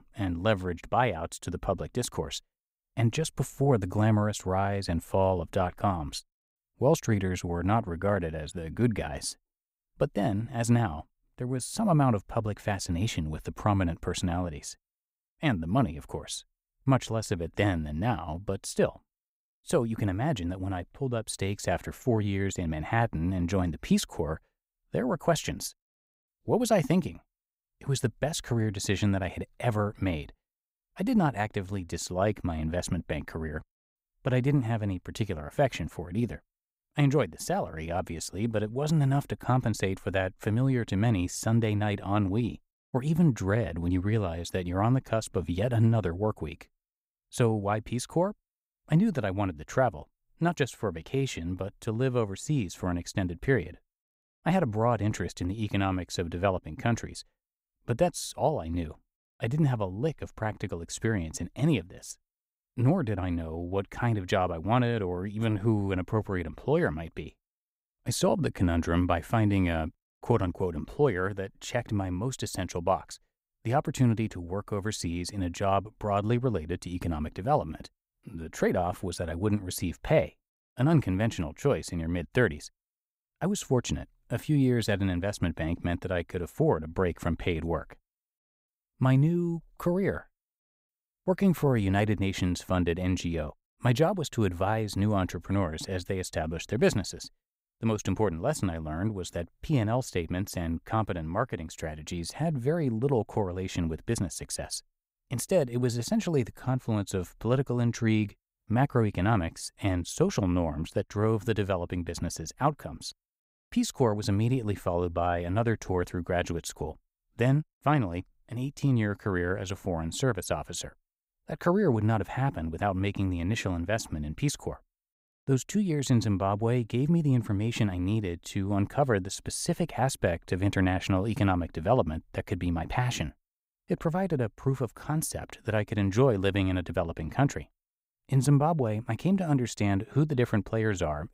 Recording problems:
none

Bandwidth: 15.5 kHz